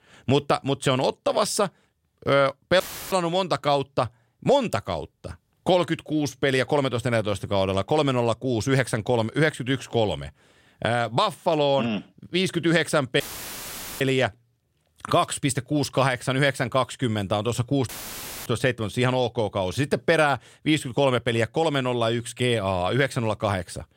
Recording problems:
audio cutting out; filled with static; at 3 s, at 13 s for 1 s and at 18 s for 0.5 s

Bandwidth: 16 kHz